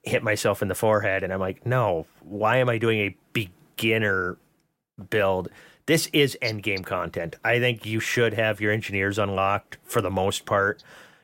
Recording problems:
none

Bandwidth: 16 kHz